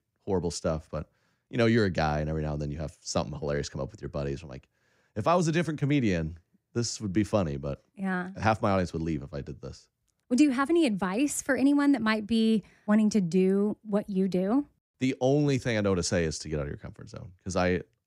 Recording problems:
none

